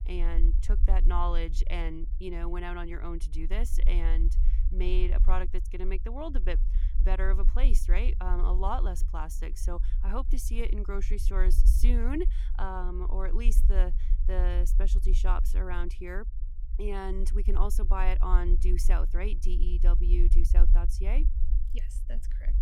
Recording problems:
low rumble; noticeable; throughout; 15 dB below the speech

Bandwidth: 17 kHz